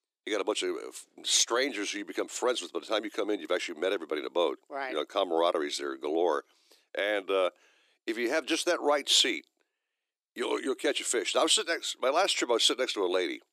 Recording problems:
thin; somewhat; fading below 300 Hz

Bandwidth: 14.5 kHz